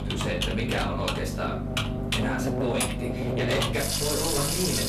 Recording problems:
off-mic speech; far
room echo; slight; dies away in 0.4 s
distortion; slight; 11% of the sound clipped
household noises; very loud; throughout; as loud as the speech
electrical hum; loud; throughout; 50 Hz, 6 dB below the speech

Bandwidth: 14 kHz